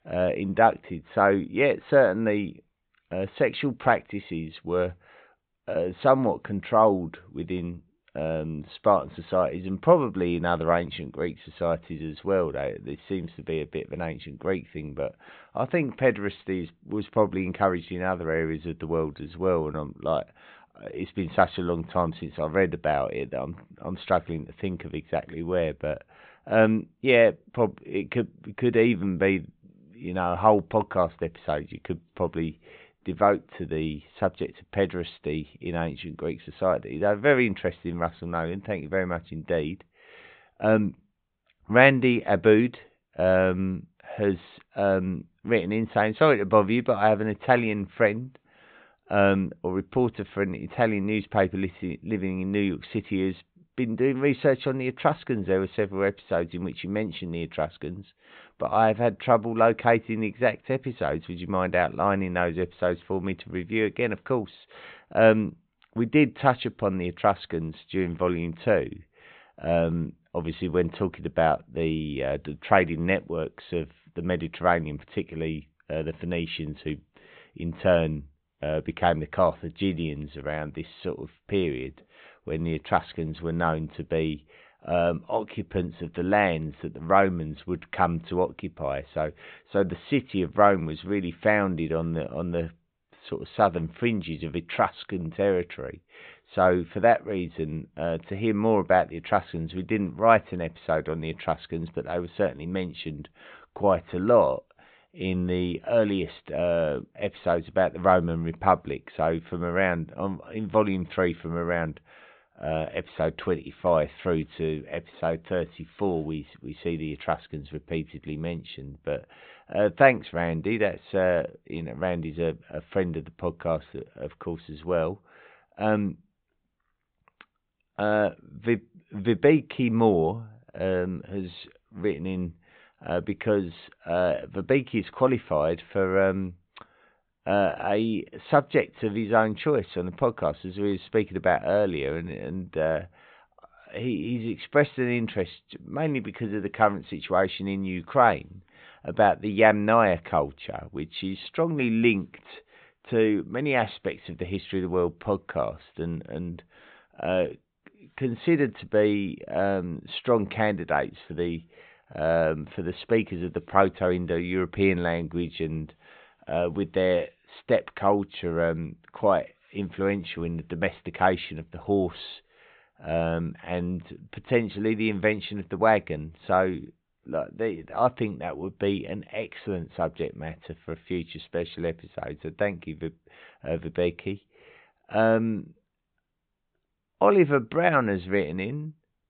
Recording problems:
high frequencies cut off; severe; nothing above 4 kHz

